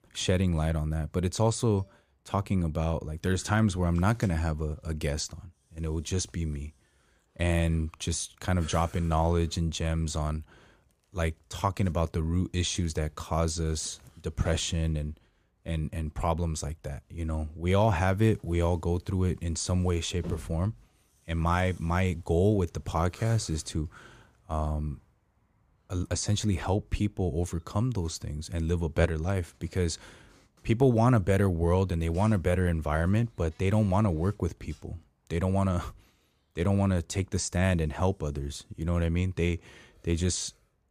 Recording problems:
none

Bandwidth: 15 kHz